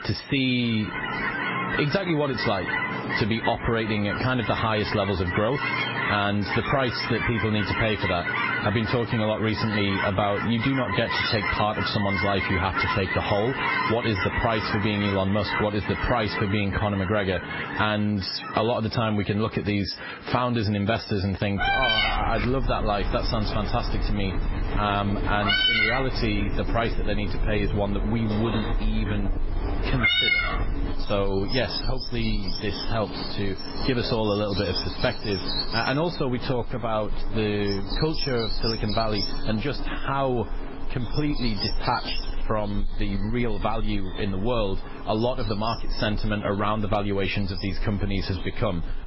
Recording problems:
garbled, watery; badly; nothing above 5.5 kHz
squashed, flat; somewhat
animal sounds; loud; throughout; 3 dB below the speech

